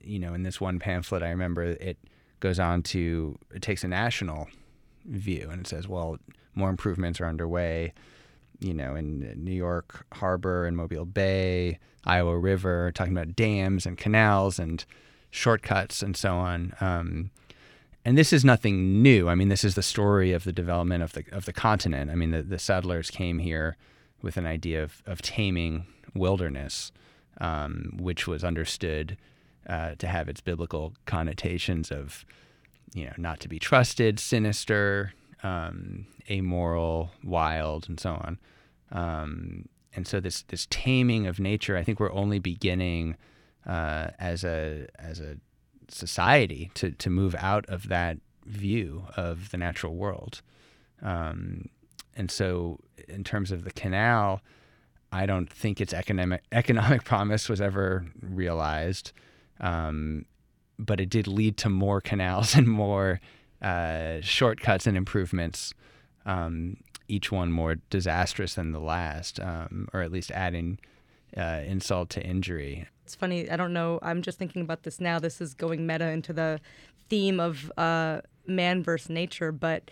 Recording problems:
none

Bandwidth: 18.5 kHz